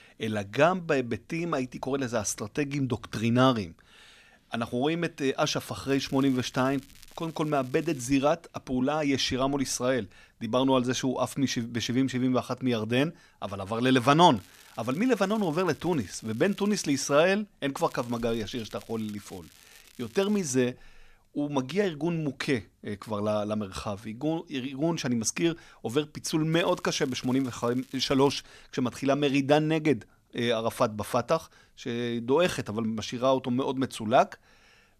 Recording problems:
crackling; faint; 4 times, first at 6 s; 25 dB below the speech

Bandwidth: 14.5 kHz